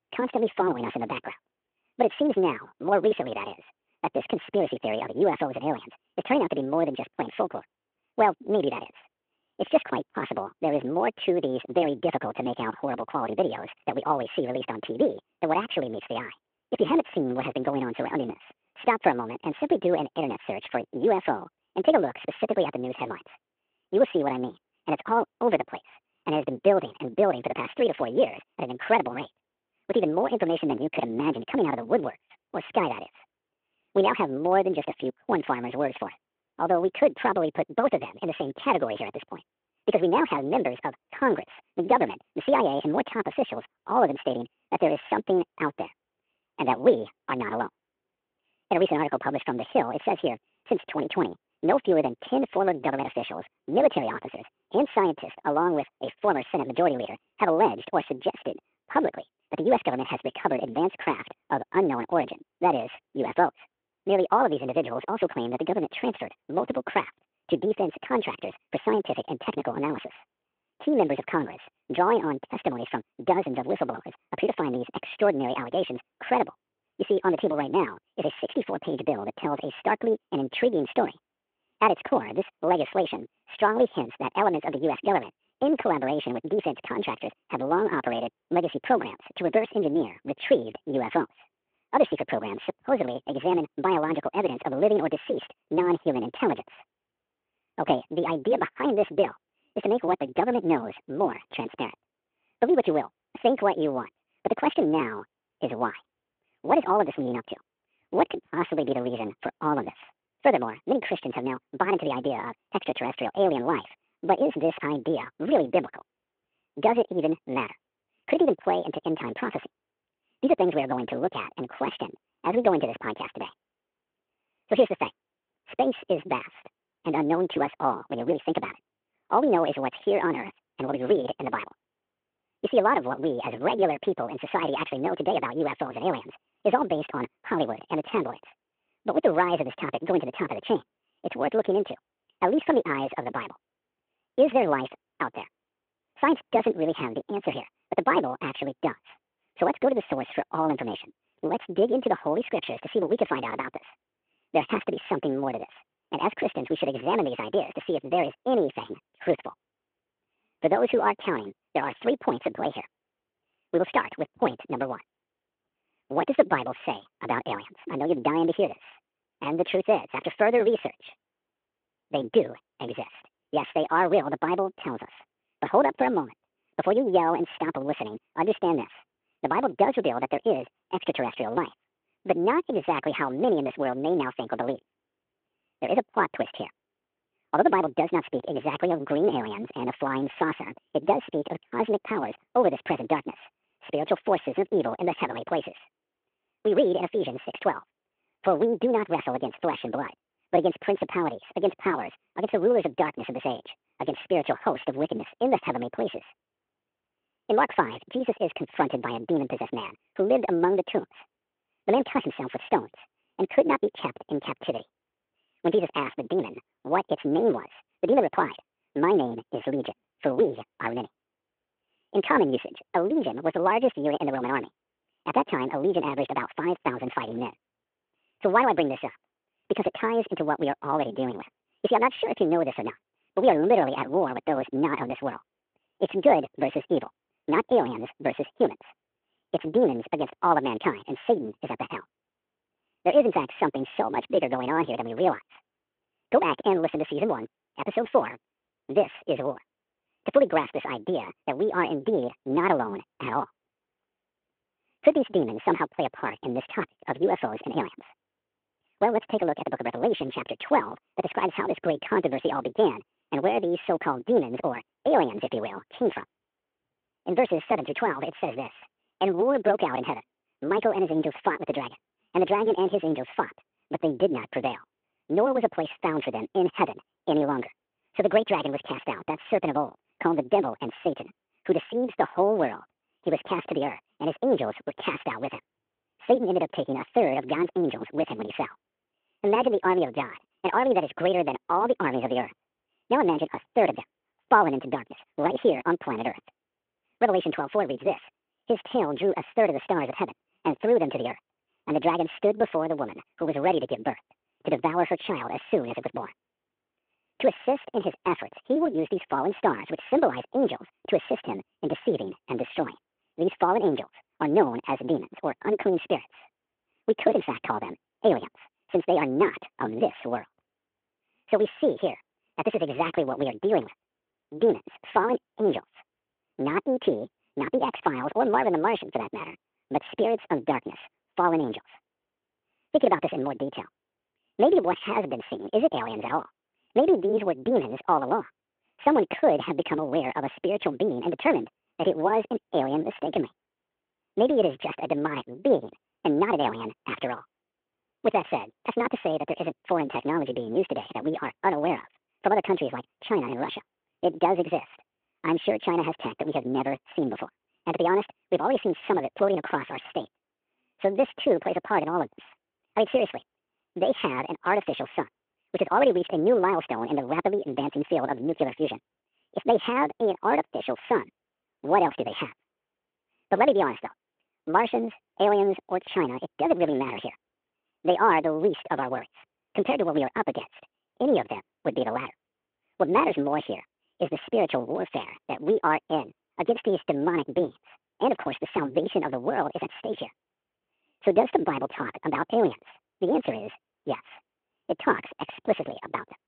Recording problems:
wrong speed and pitch; too fast and too high; 1.5 times normal speed
phone-call audio

